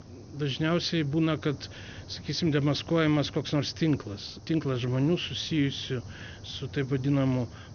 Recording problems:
high frequencies cut off; noticeable; nothing above 6.5 kHz
hiss; noticeable; throughout; 20 dB below the speech

